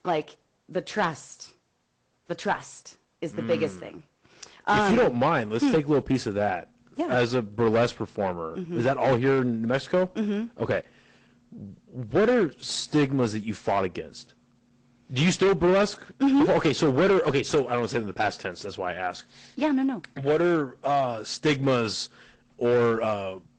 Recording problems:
distortion; heavy; 7% of the sound clipped
garbled, watery; slightly; nothing above 8 kHz

